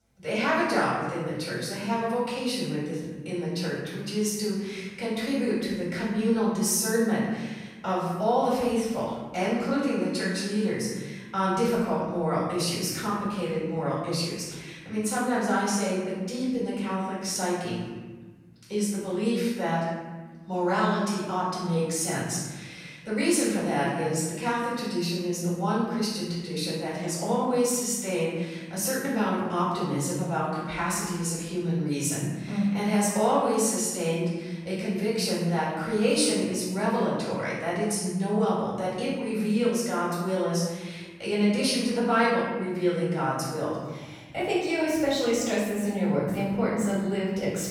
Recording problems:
room echo; strong; dies away in 1.5 s
off-mic speech; far

